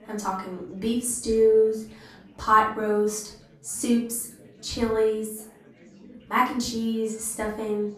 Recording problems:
off-mic speech; far
room echo; slight; dies away in 0.4 s
chatter from many people; faint; throughout; 25 dB below the speech

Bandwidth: 14 kHz